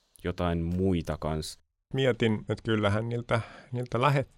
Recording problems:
none

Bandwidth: 16 kHz